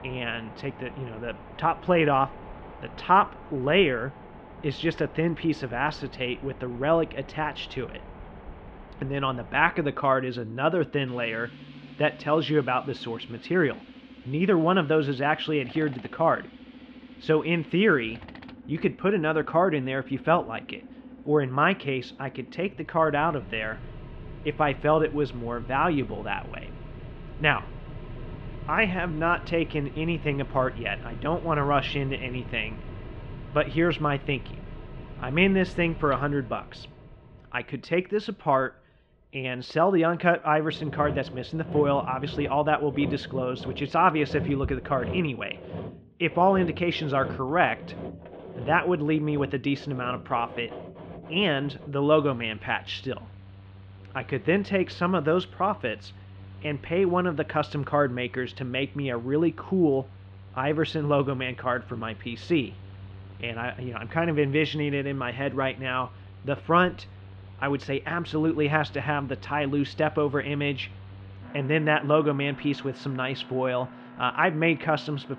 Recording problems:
muffled; slightly; fading above 3.5 kHz
machinery noise; noticeable; throughout; 15 dB below the speech

